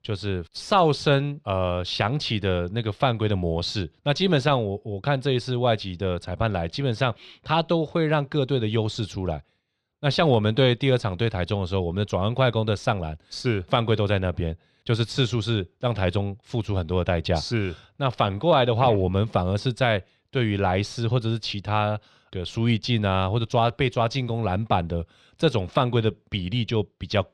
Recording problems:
muffled; very slightly; fading above 3 kHz

